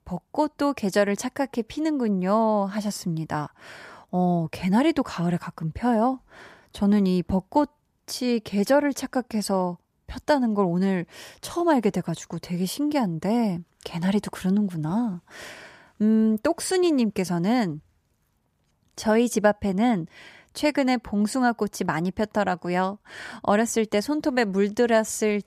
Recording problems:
none

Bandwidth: 14.5 kHz